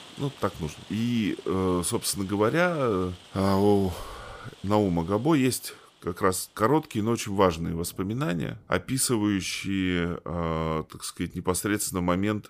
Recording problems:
rain or running water; faint; throughout; 25 dB below the speech

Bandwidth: 15 kHz